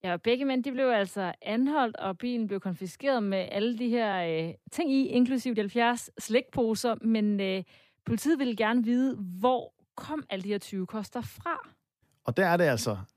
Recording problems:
uneven, jittery; strongly; from 1 to 13 s

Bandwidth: 14.5 kHz